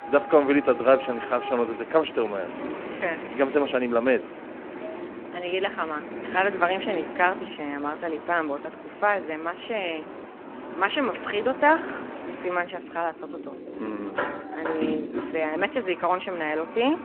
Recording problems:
phone-call audio
traffic noise; noticeable; throughout; 10 dB below the speech

